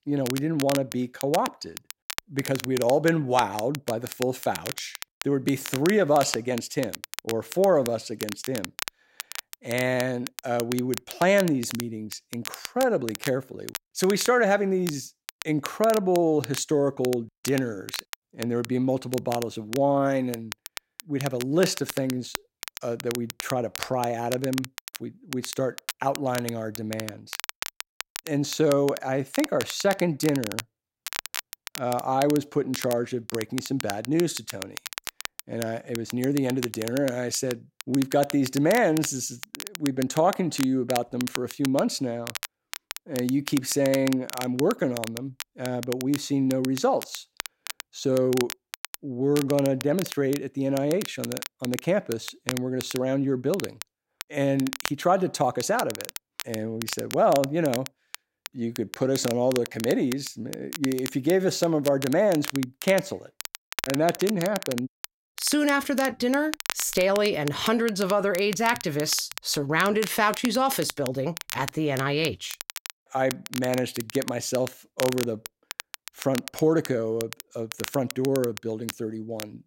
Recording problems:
crackle, like an old record; noticeable; 10 dB below the speech

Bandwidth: 16 kHz